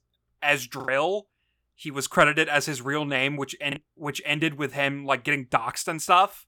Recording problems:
choppy; occasionally; at 1 s and at 3.5 s; 4% of the speech affected

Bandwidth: 18.5 kHz